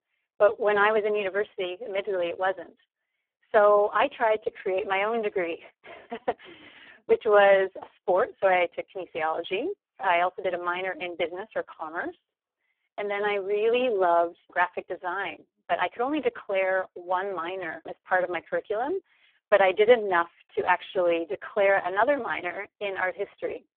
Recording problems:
phone-call audio; poor line

